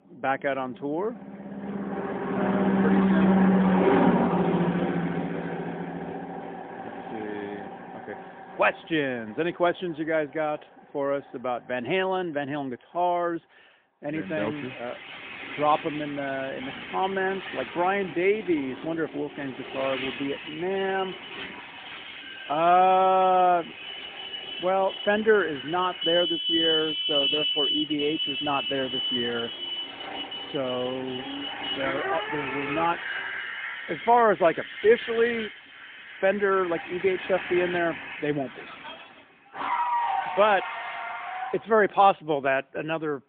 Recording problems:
phone-call audio; poor line; nothing above 3.5 kHz
traffic noise; loud; throughout; 2 dB below the speech

